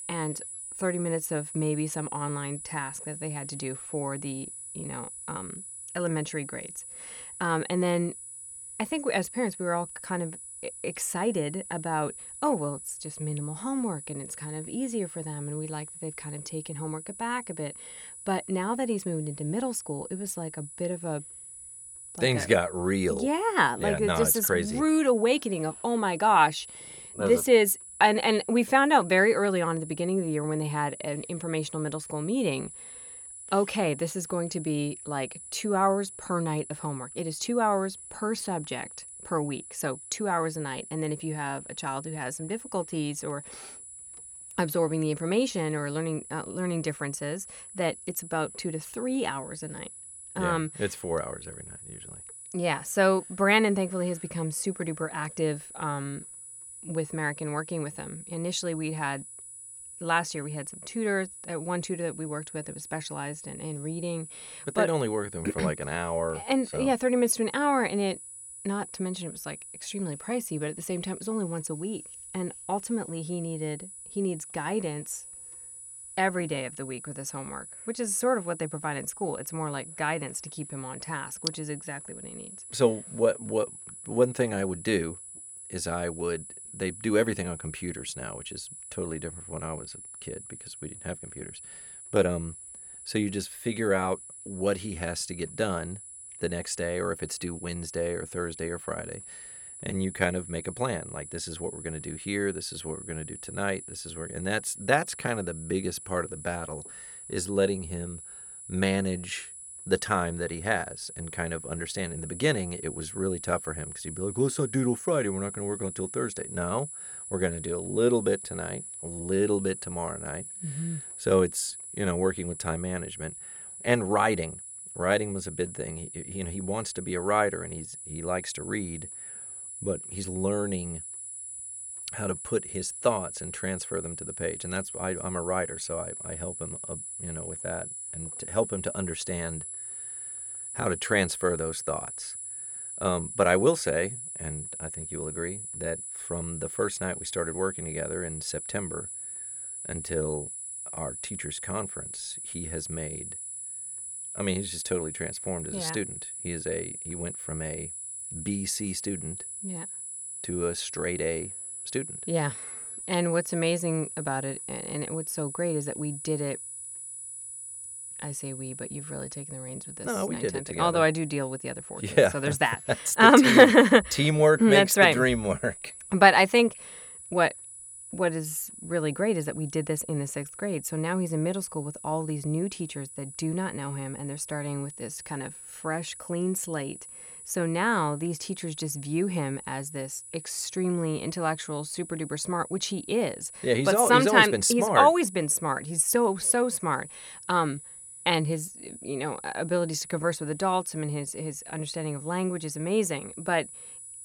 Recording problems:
high-pitched whine; noticeable; throughout; 10 kHz, 10 dB below the speech

